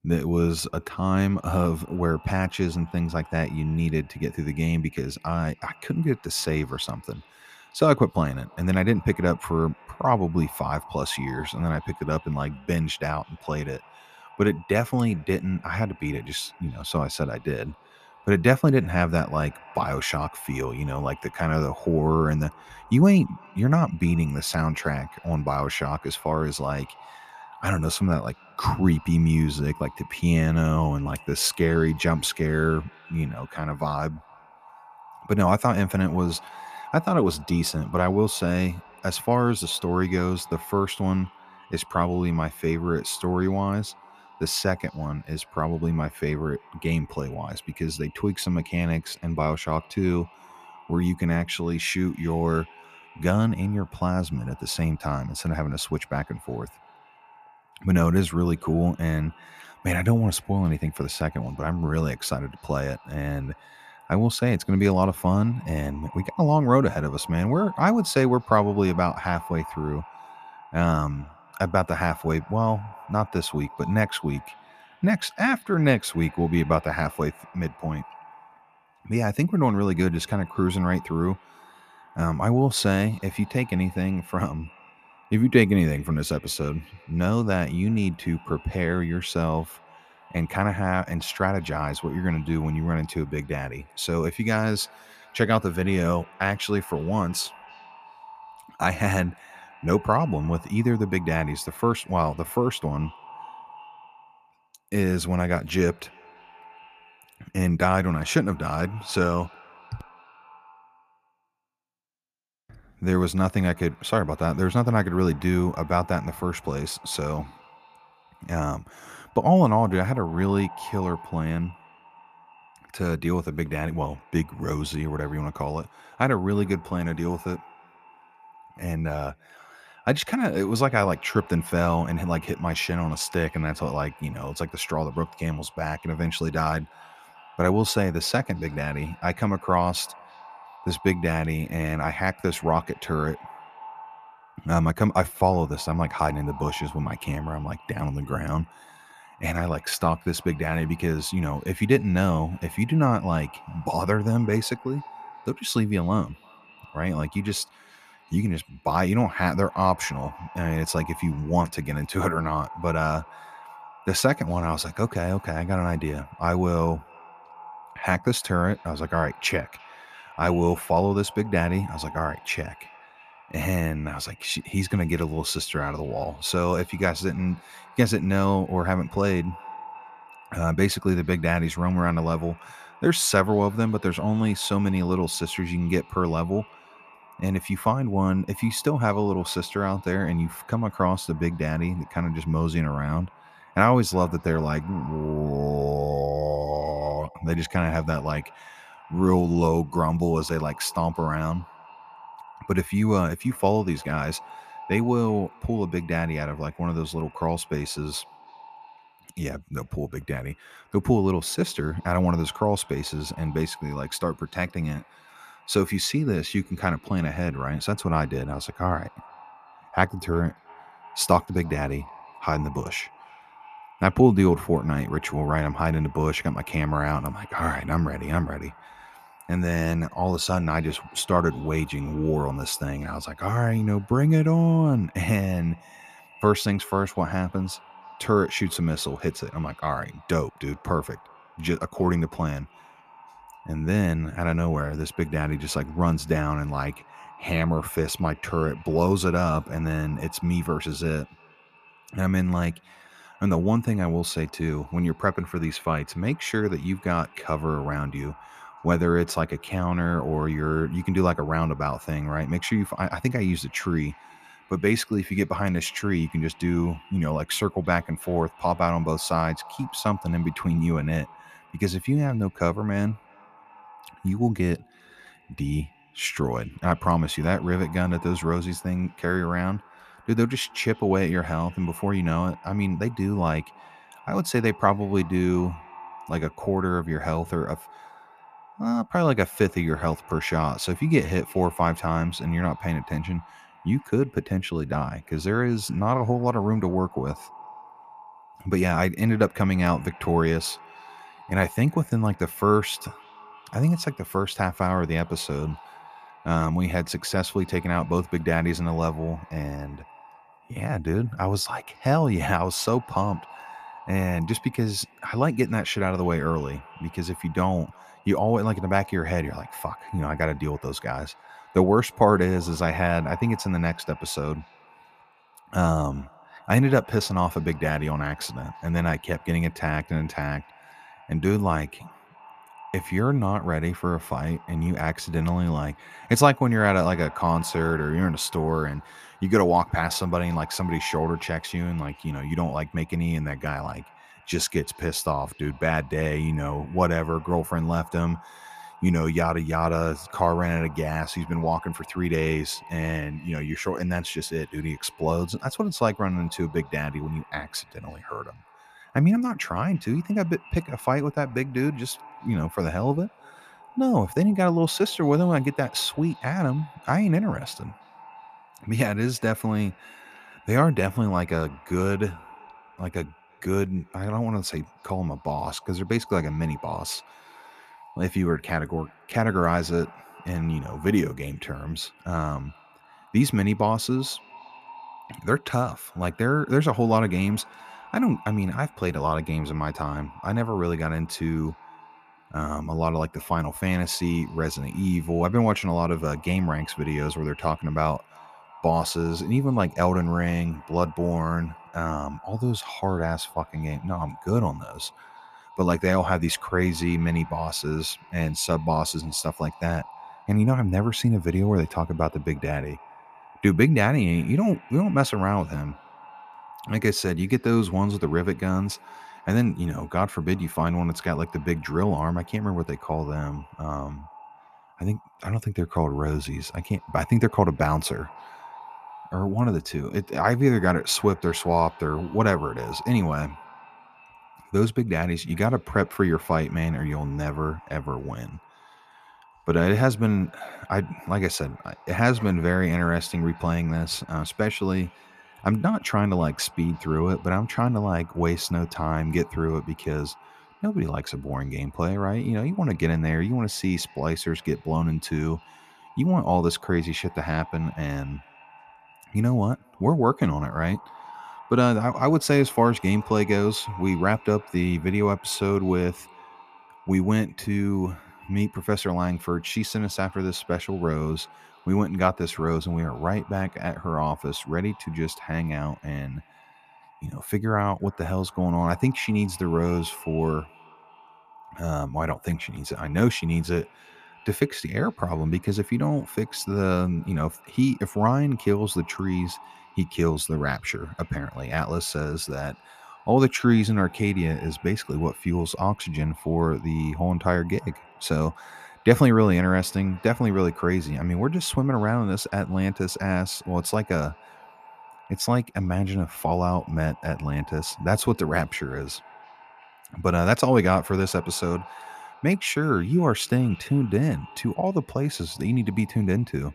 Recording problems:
echo of what is said; faint; throughout; 340 ms later, 20 dB below the speech

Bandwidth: 14.5 kHz